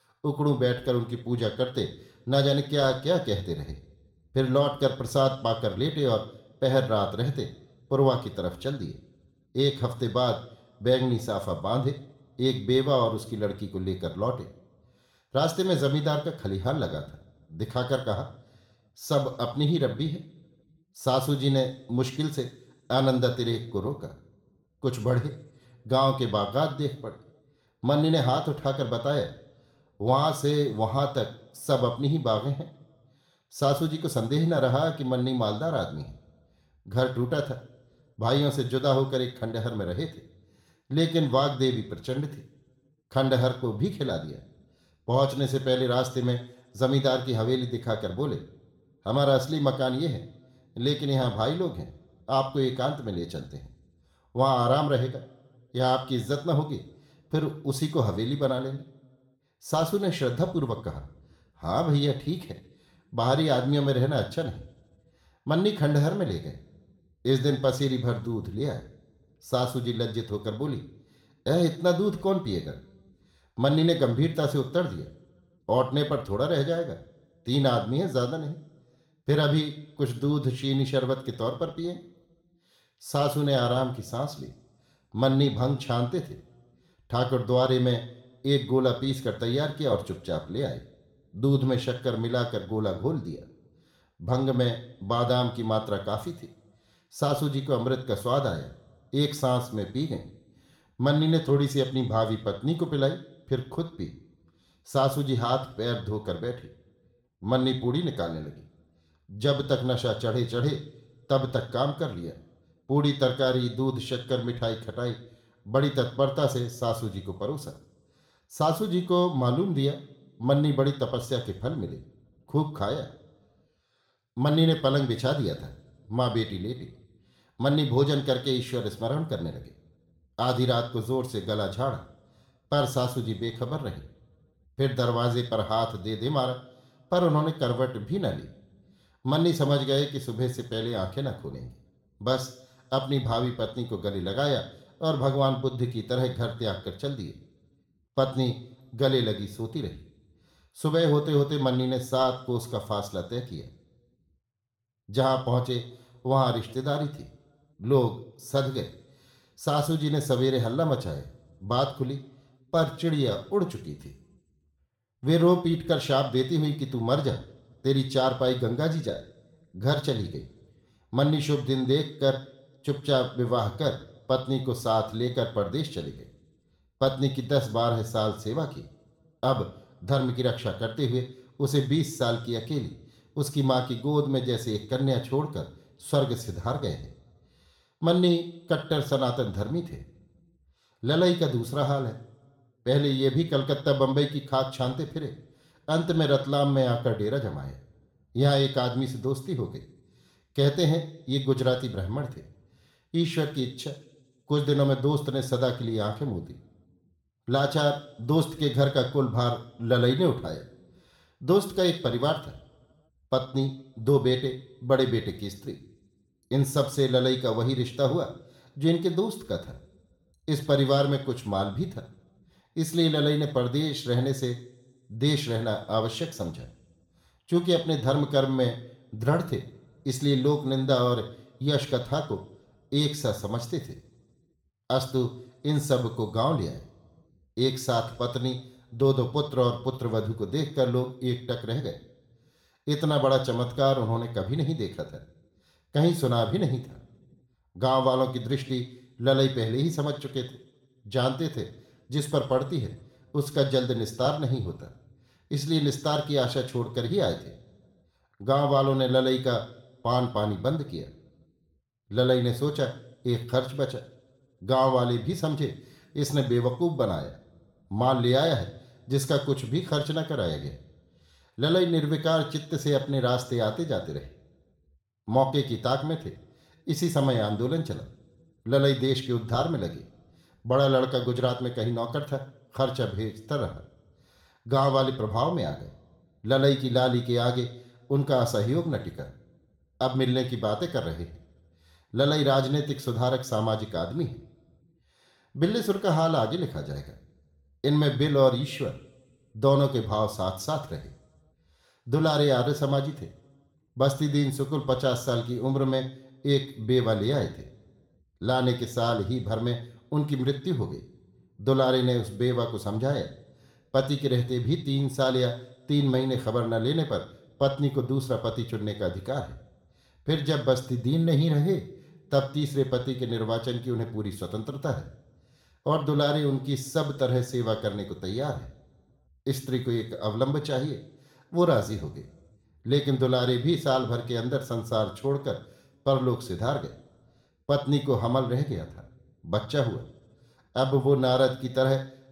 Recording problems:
room echo; slight; dies away in 0.5 s
off-mic speech; somewhat distant

